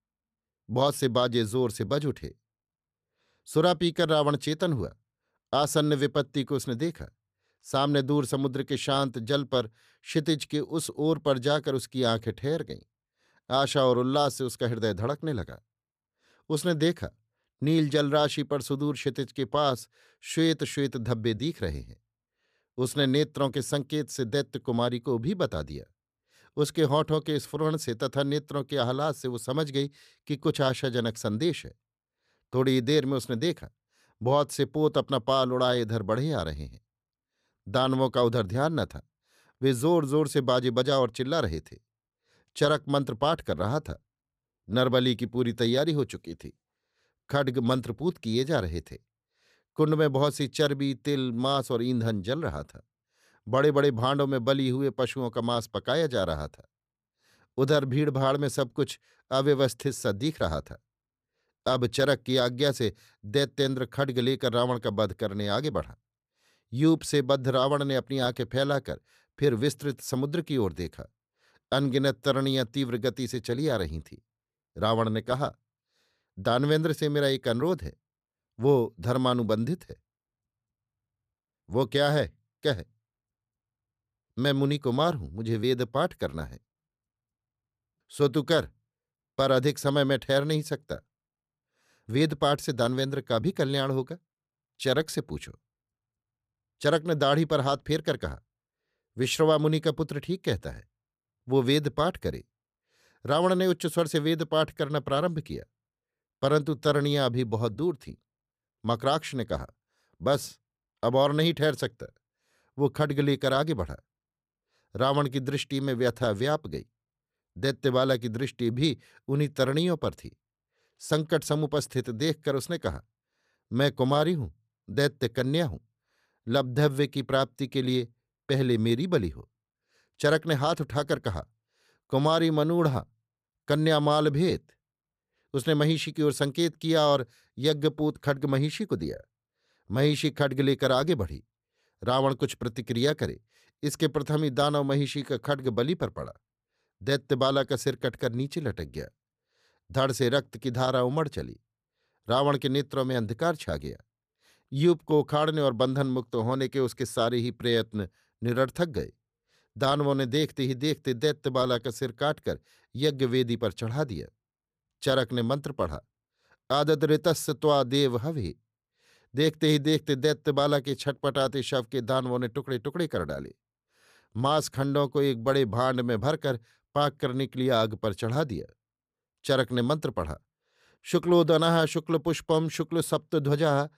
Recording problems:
none

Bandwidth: 14.5 kHz